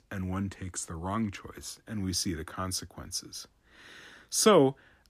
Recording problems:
none

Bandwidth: 15 kHz